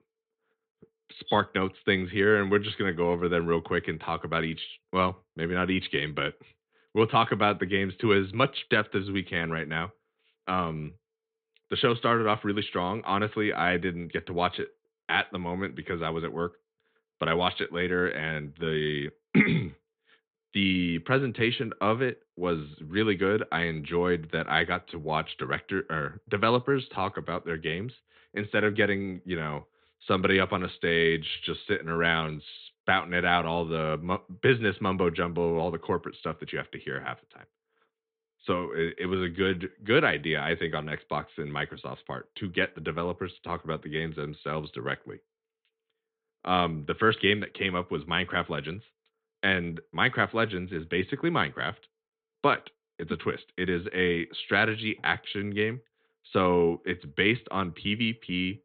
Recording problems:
high frequencies cut off; severe; nothing above 4 kHz

